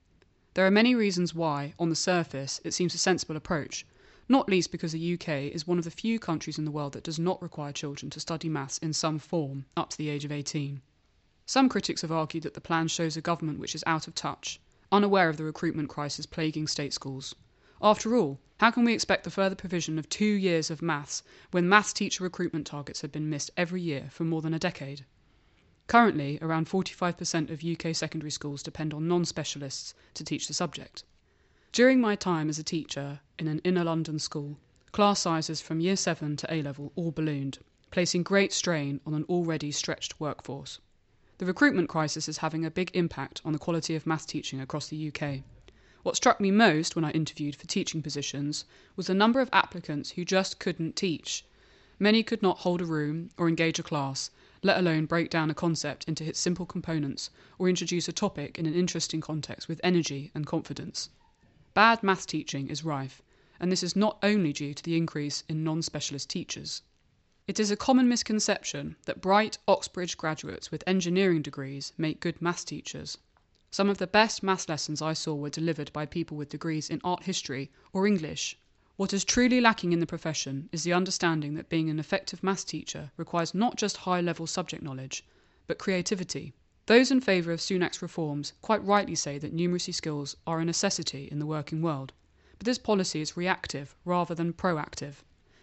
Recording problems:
high frequencies cut off; noticeable; nothing above 7.5 kHz

